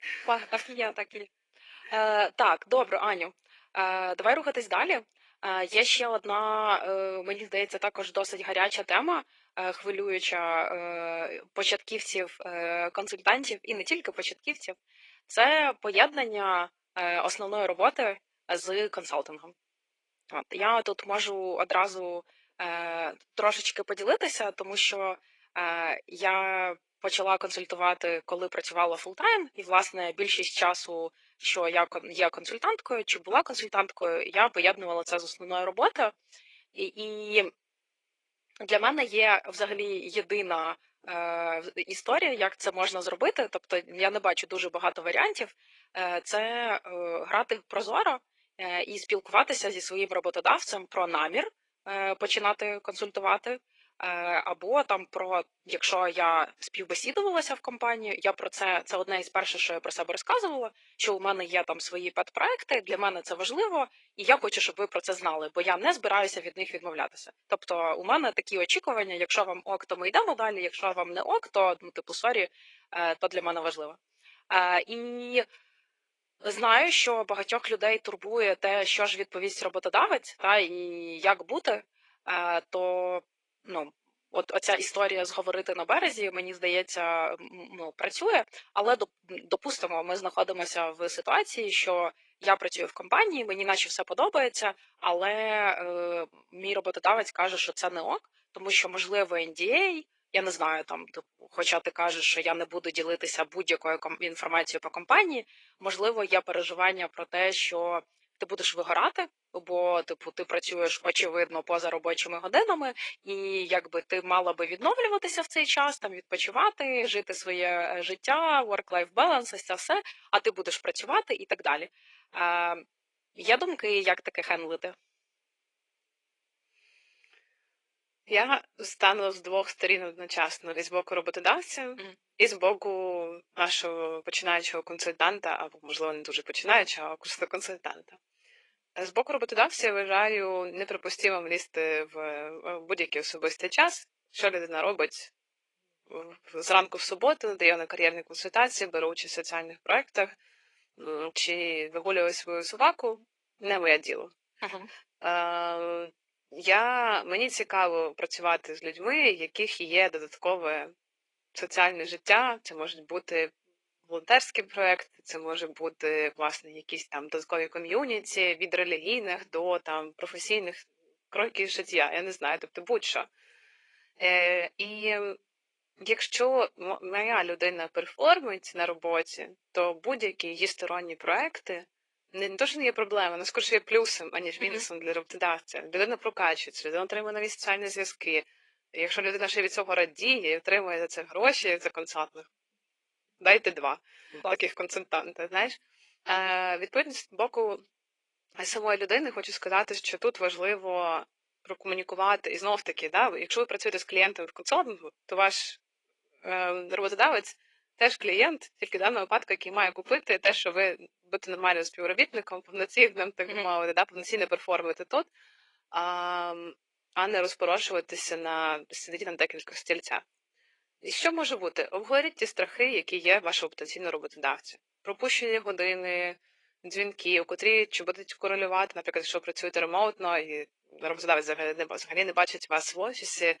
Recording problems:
thin; very; fading below 450 Hz
garbled, watery; slightly

